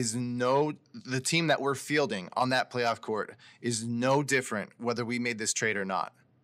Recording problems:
abrupt cut into speech; at the start

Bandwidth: 15.5 kHz